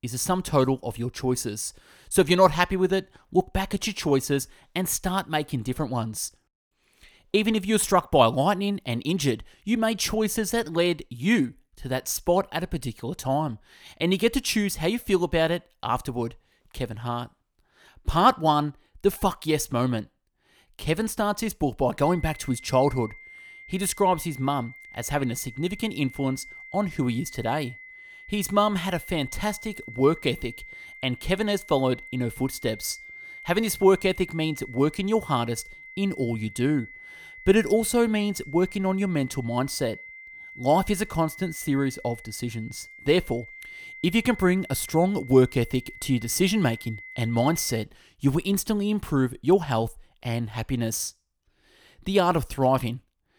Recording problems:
high-pitched whine; noticeable; from 22 to 48 s; 2 kHz, 15 dB below the speech

